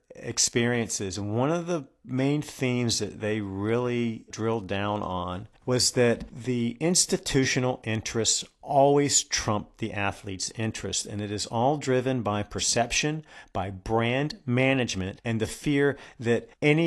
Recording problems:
garbled, watery; slightly; nothing above 11.5 kHz
abrupt cut into speech; at the end

